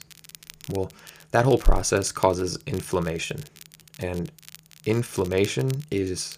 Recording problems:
crackle, like an old record; noticeable; 20 dB below the speech

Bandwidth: 15 kHz